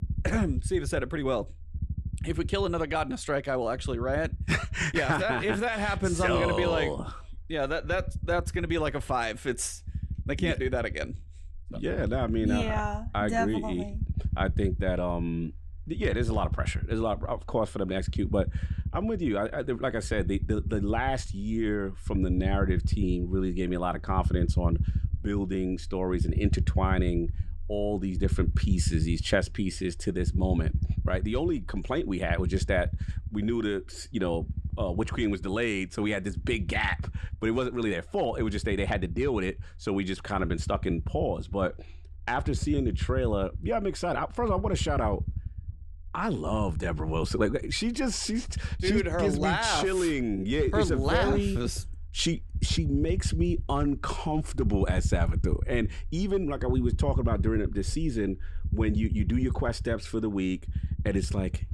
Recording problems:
low rumble; noticeable; throughout; 15 dB below the speech

